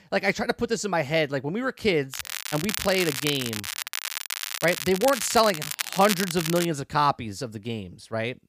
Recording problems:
crackling; loud; from 2 to 6.5 s; 5 dB below the speech

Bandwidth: 15 kHz